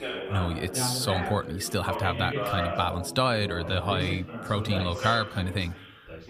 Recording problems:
background chatter; loud; throughout; 4 voices, 5 dB below the speech

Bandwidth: 15 kHz